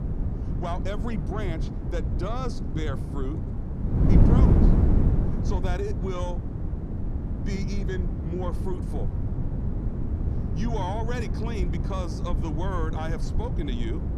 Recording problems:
wind noise on the microphone; heavy; 2 dB below the speech

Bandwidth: 15.5 kHz